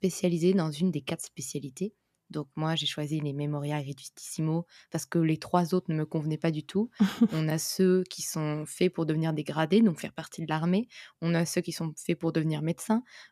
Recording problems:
none

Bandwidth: 14.5 kHz